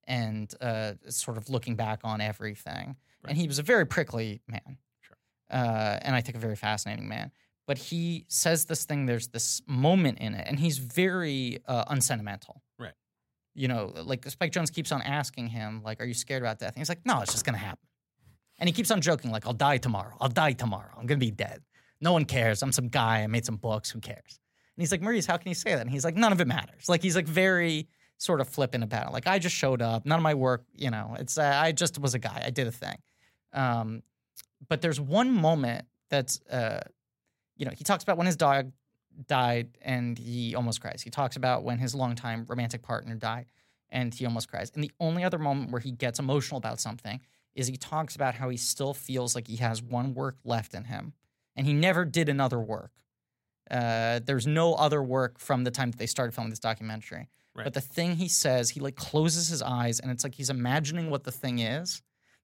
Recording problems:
none

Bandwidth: 16 kHz